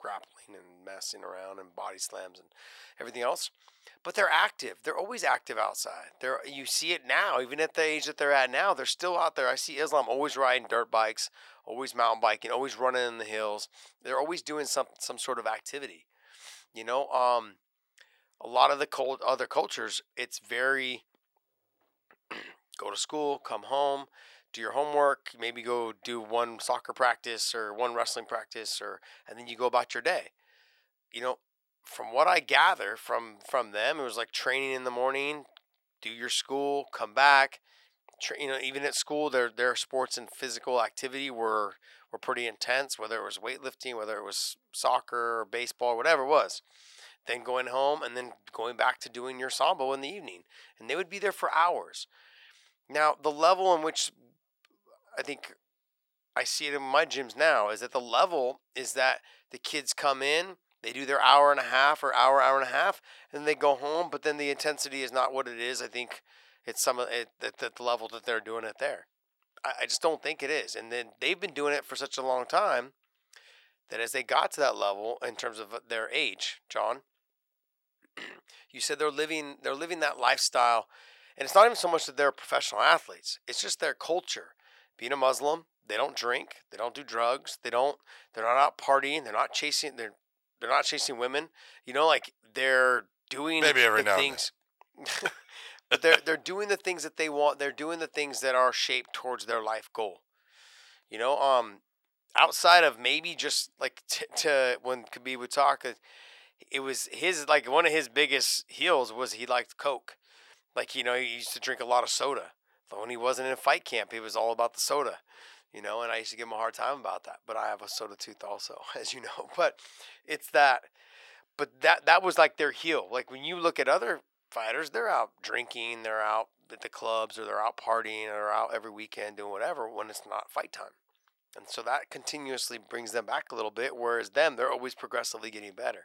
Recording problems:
thin; very; fading below 750 Hz

